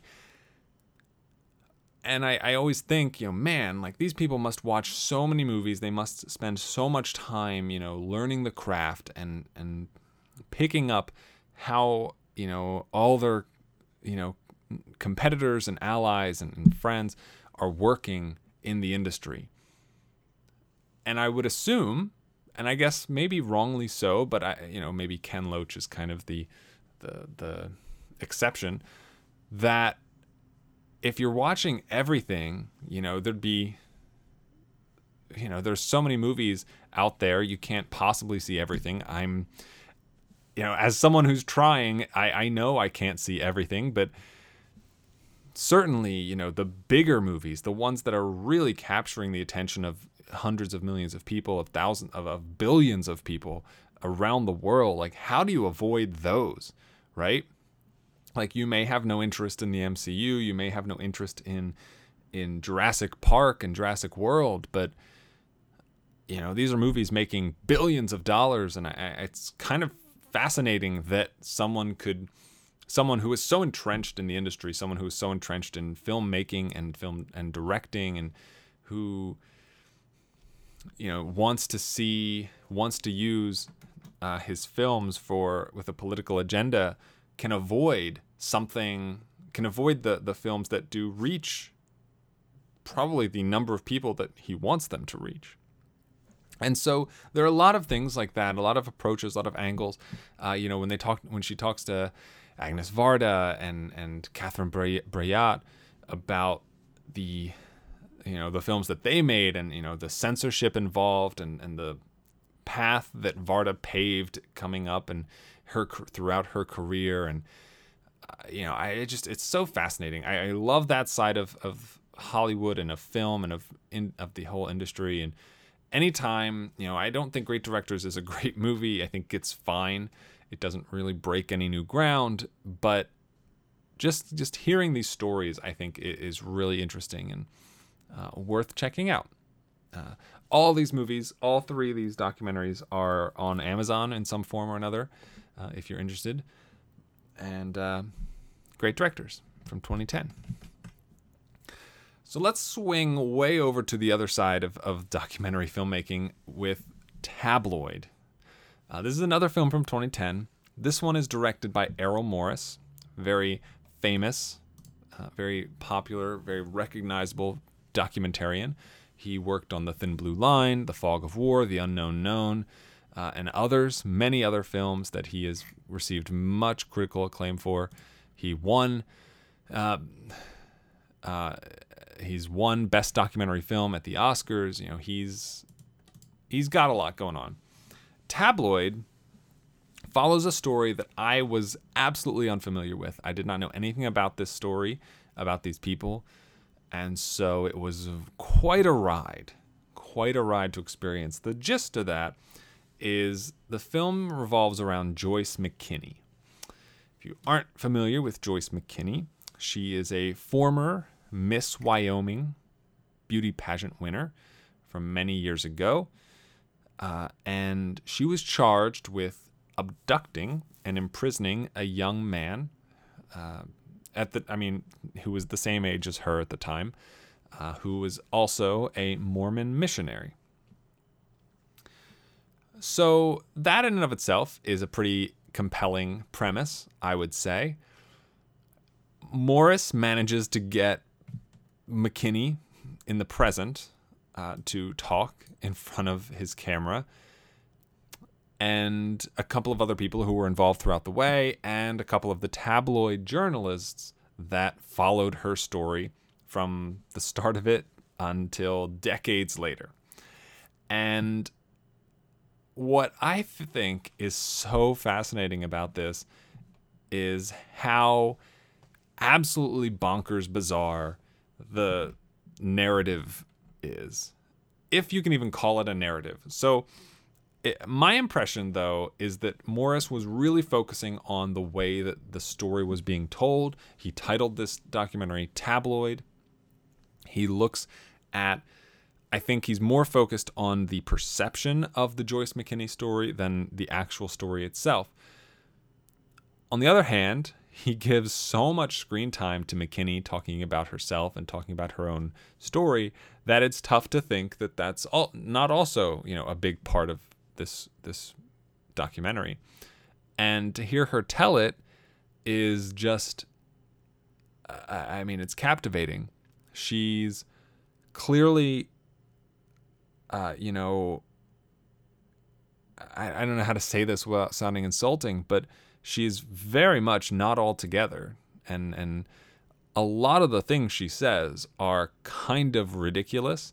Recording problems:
none

